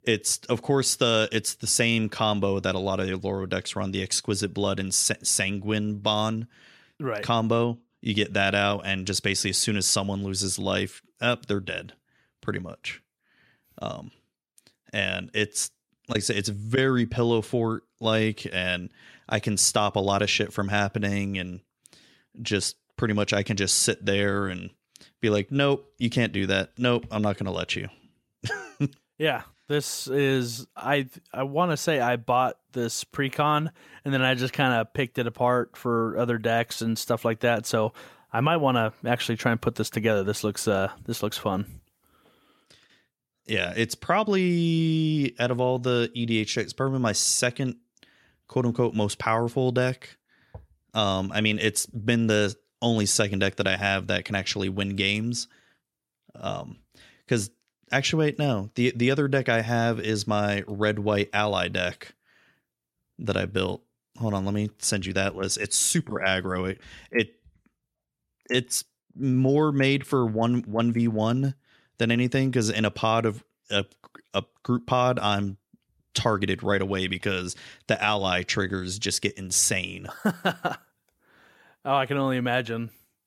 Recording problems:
none

